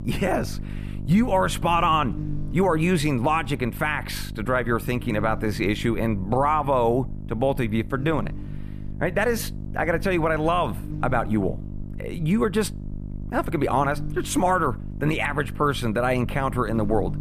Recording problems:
electrical hum; noticeable; throughout; 50 Hz, 20 dB below the speech

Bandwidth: 14.5 kHz